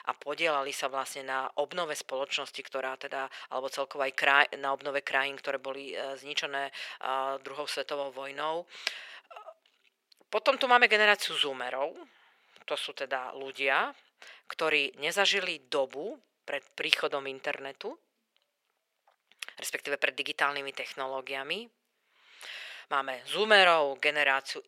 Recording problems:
thin; very; fading below 450 Hz

